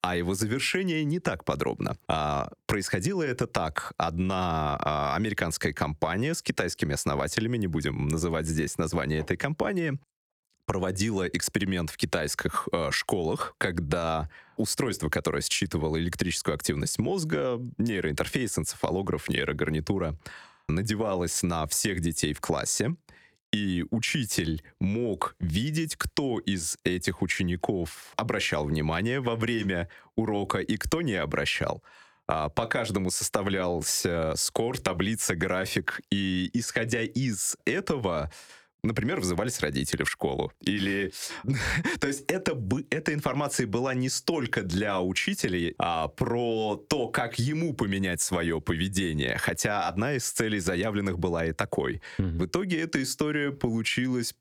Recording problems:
squashed, flat; somewhat

